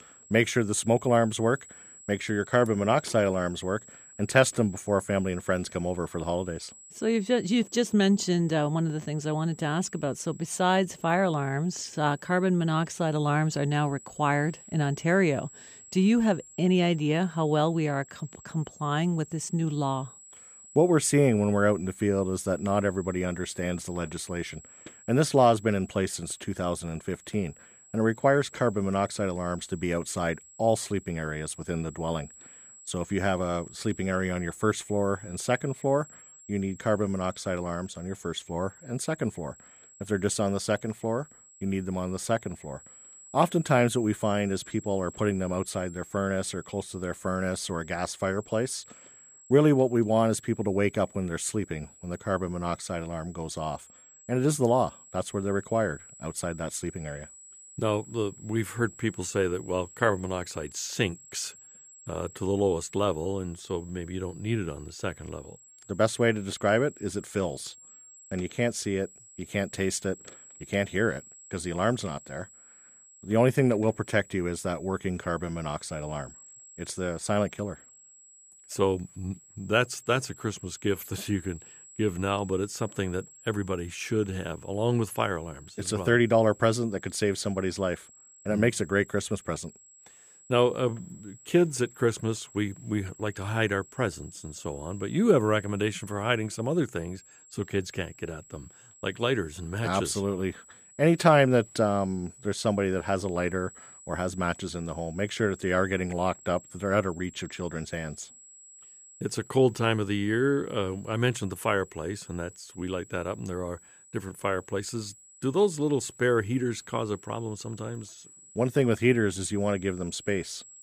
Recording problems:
high-pitched whine; faint; throughout; 7.5 kHz, 20 dB below the speech

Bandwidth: 15 kHz